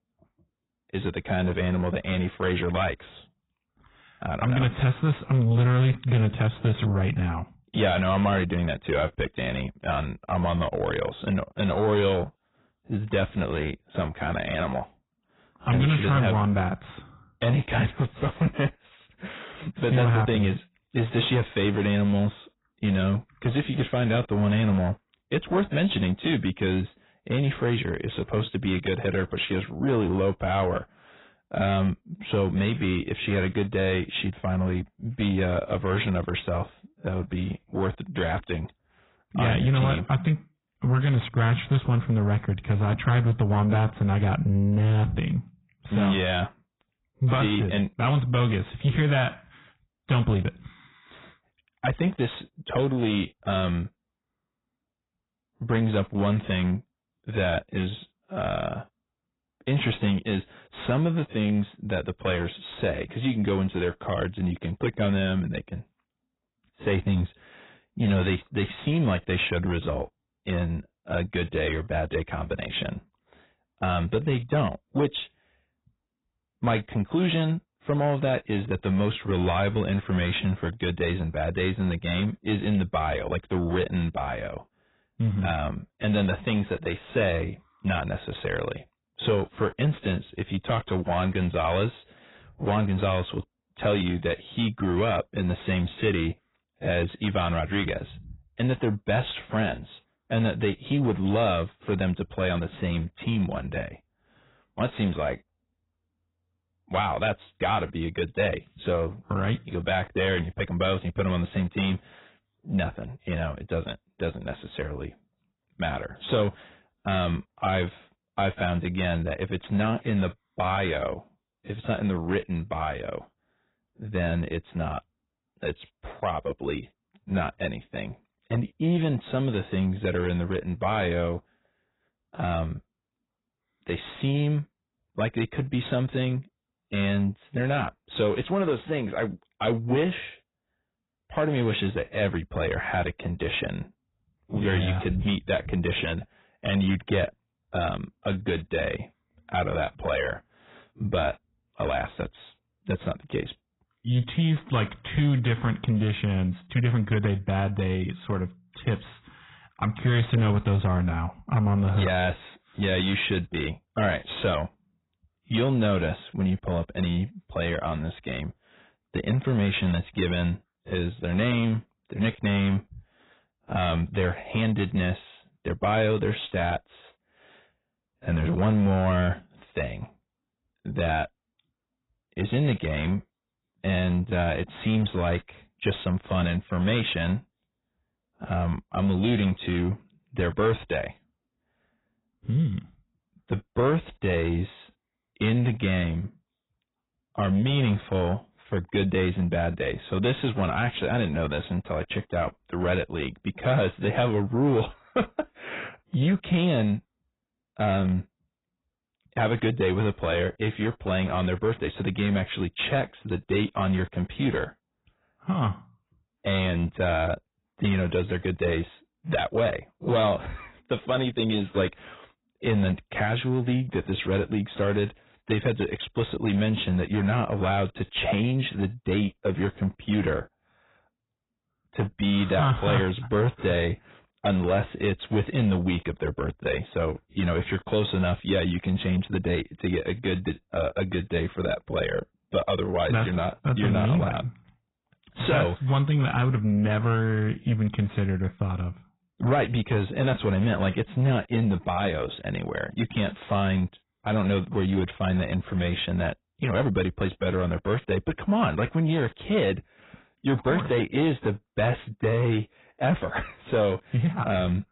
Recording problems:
garbled, watery; badly; nothing above 4 kHz
distortion; slight; 10 dB below the speech

